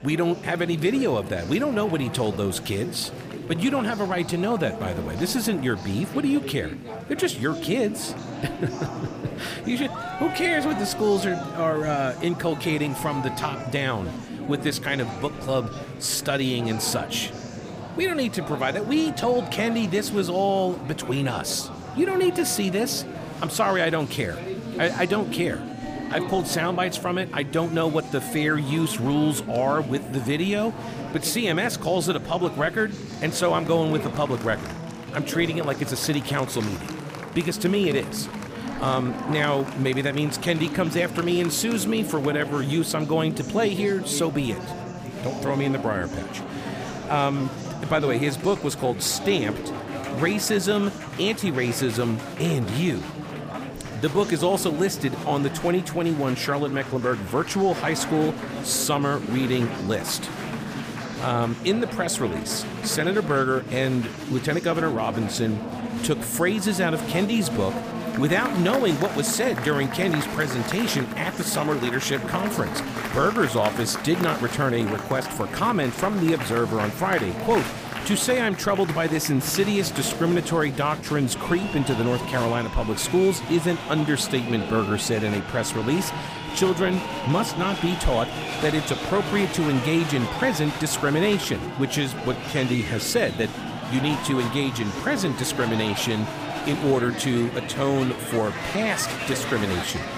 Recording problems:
chatter from many people; loud; throughout; 7 dB below the speech

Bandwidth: 15 kHz